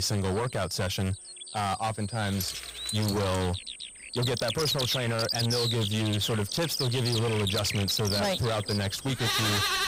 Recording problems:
distortion; heavy; 24% of the sound clipped
animal sounds; loud; throughout; 1 dB below the speech
high-pitched whine; noticeable; throughout; 8.5 kHz, 15 dB below the speech
abrupt cut into speech; at the start
jangling keys; noticeable; from 2.5 to 3.5 s; peak 6 dB below the speech

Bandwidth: 15.5 kHz